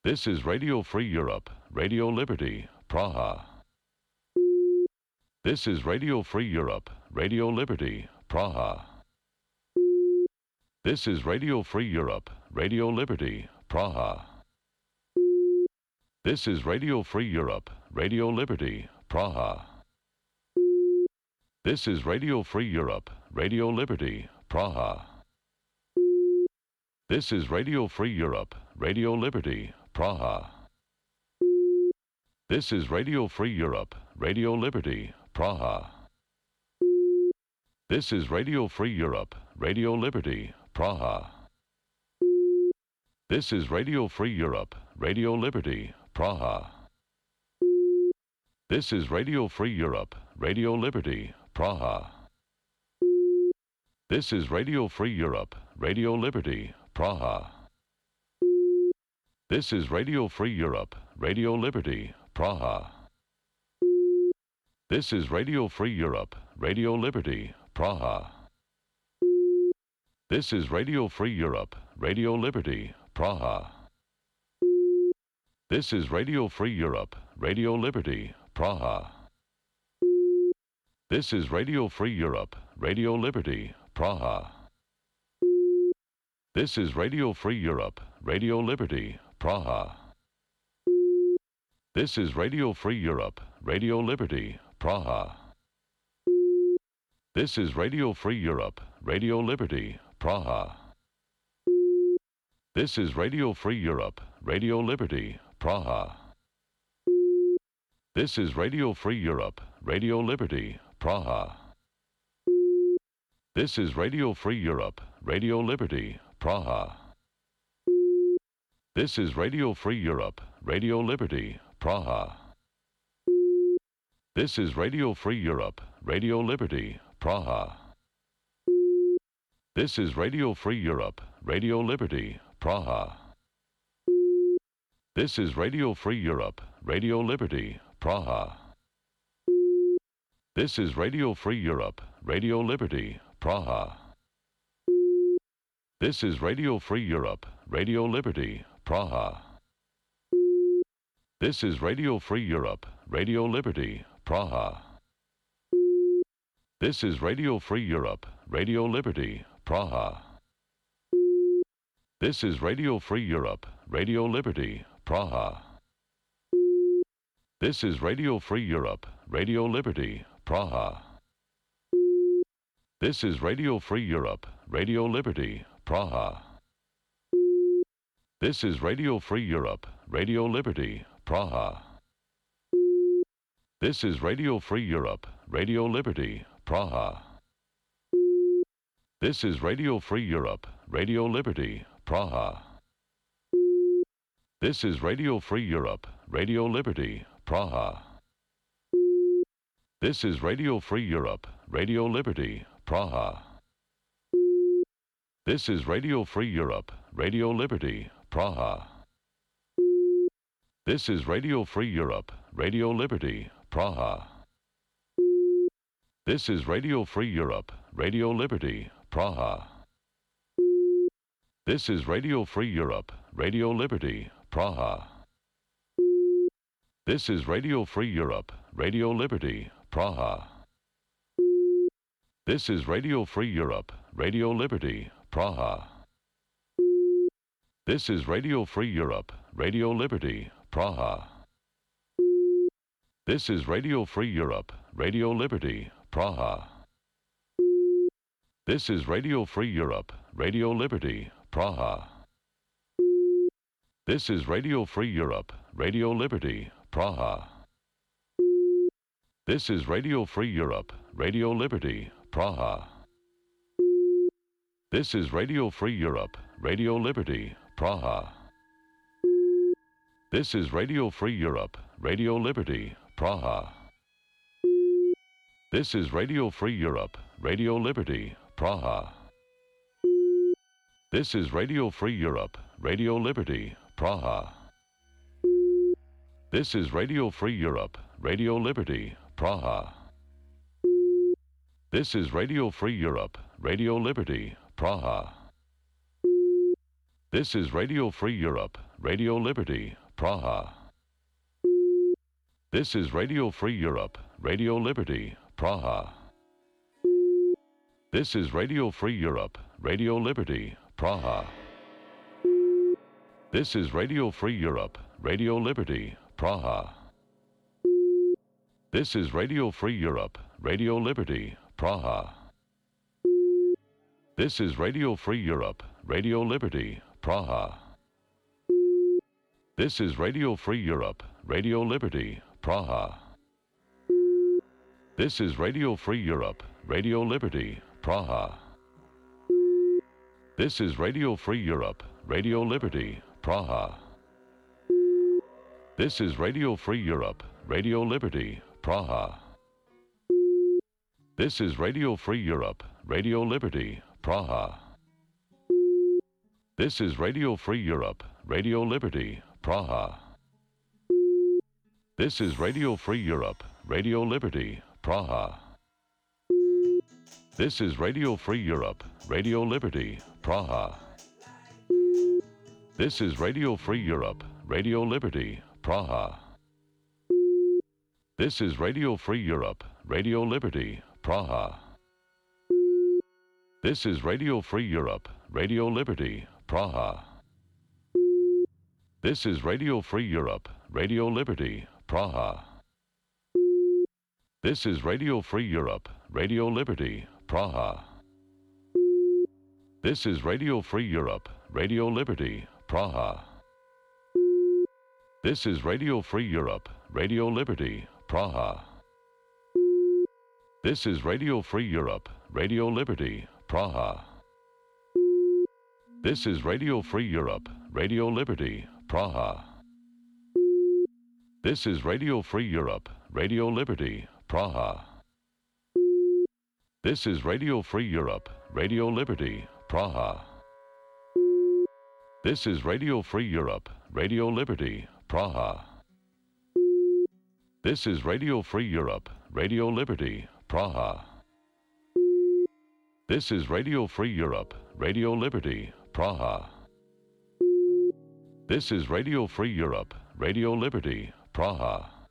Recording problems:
background music; faint; from 4:21 on; 30 dB below the speech

